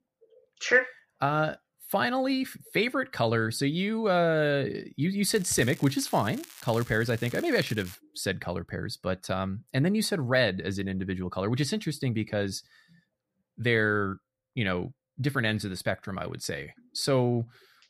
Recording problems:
crackling; noticeable; from 5.5 to 8 s; 20 dB below the speech

